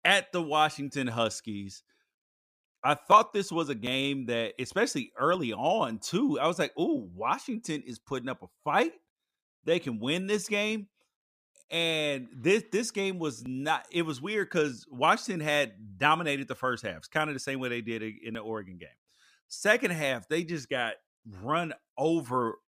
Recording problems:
none

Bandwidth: 15 kHz